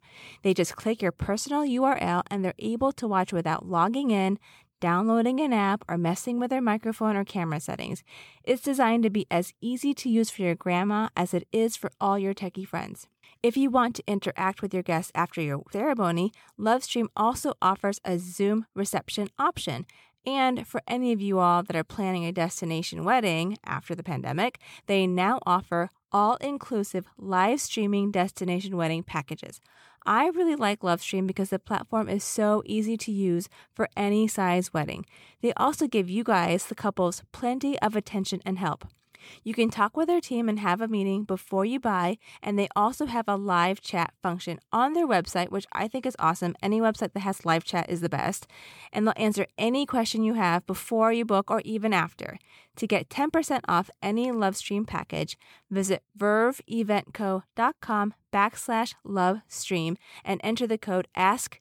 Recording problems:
none

